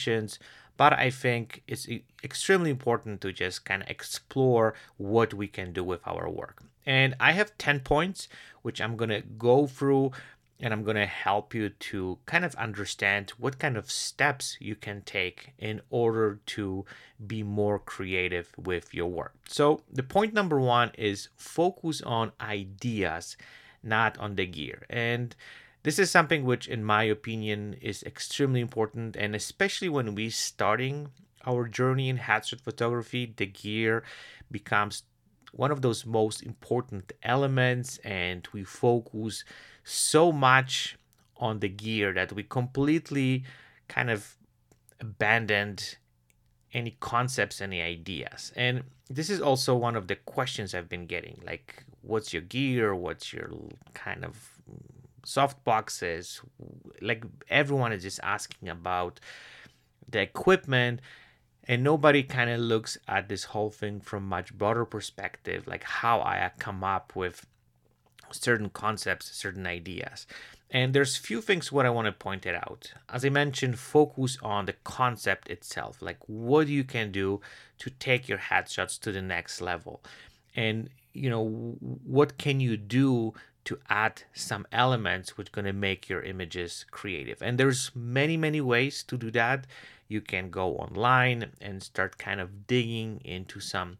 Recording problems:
abrupt cut into speech; at the start

